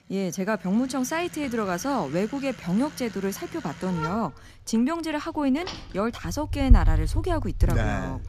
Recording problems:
traffic noise; loud; throughout; 1 dB below the speech

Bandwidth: 14.5 kHz